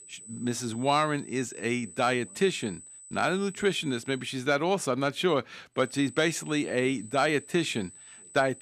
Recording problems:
high-pitched whine; noticeable; until 4.5 s and from 6 s on; 8 kHz, 15 dB below the speech

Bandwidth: 14.5 kHz